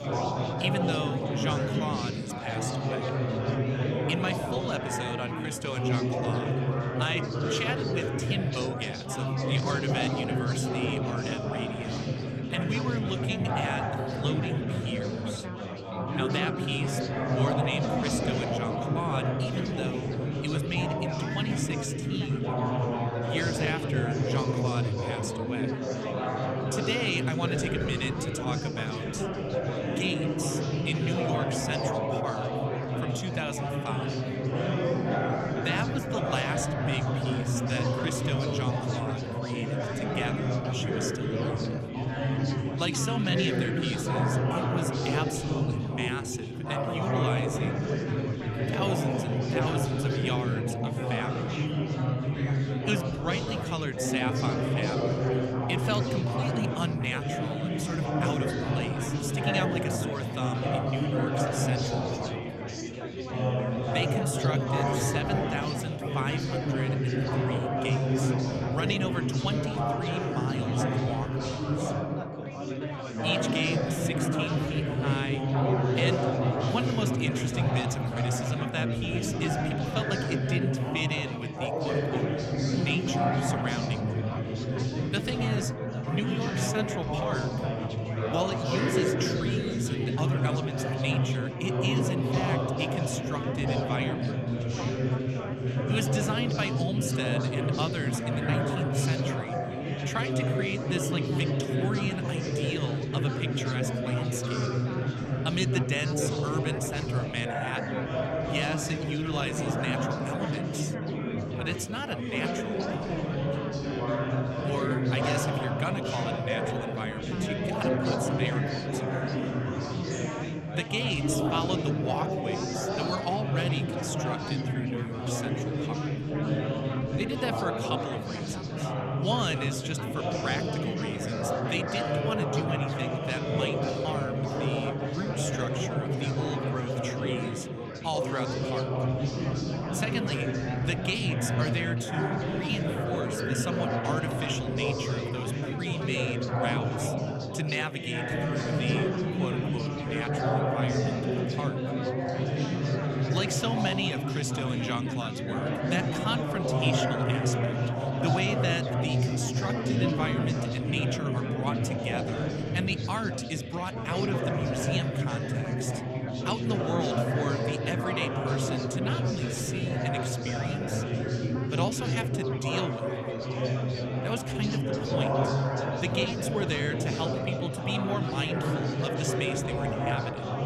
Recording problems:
chatter from many people; very loud; throughout; 5 dB above the speech

